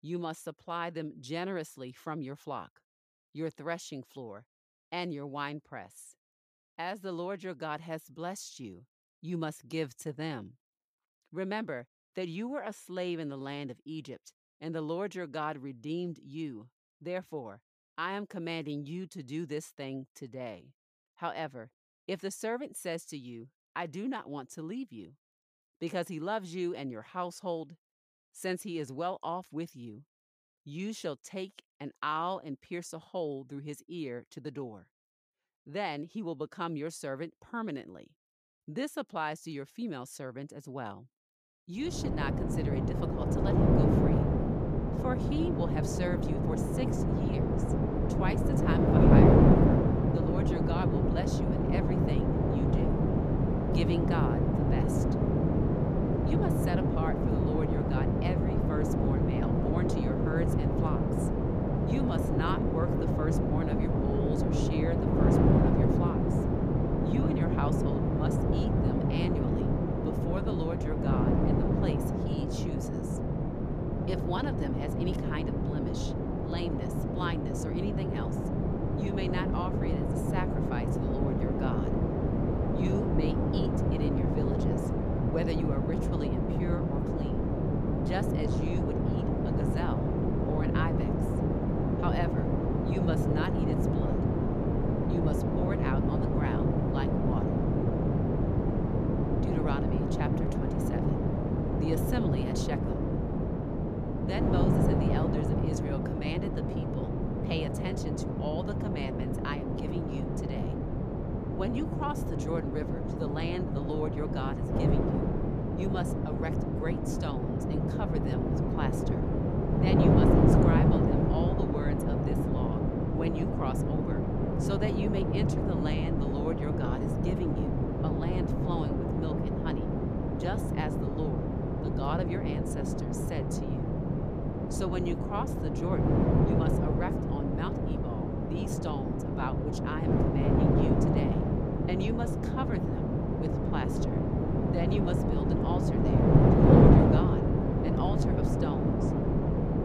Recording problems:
wind noise on the microphone; heavy; from 42 s on; 5 dB above the speech

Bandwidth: 15 kHz